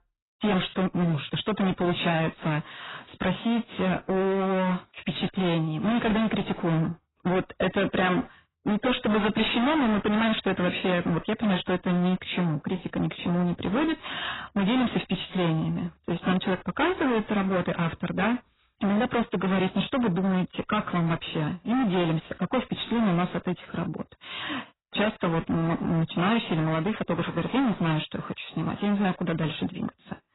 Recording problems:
distortion; heavy; 24% of the sound clipped
garbled, watery; badly; nothing above 4 kHz

